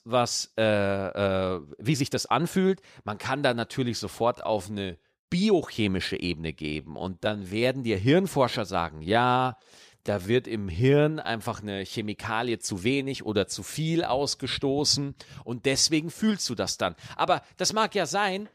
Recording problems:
uneven, jittery; strongly; from 2 to 13 s

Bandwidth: 14.5 kHz